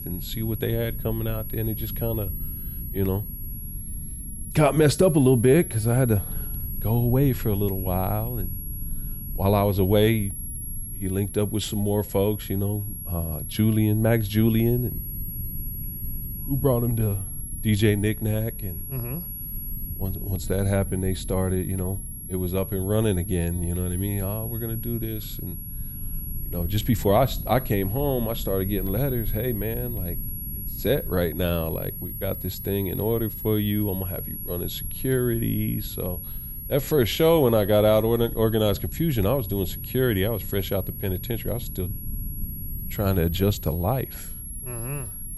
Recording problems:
high-pitched whine; loud; throughout; 11.5 kHz, 9 dB below the speech
low rumble; faint; throughout; 25 dB below the speech

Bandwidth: 15 kHz